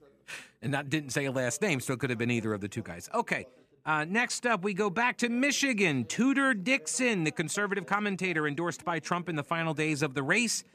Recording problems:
background chatter; faint; throughout; 2 voices, 30 dB below the speech

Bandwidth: 14.5 kHz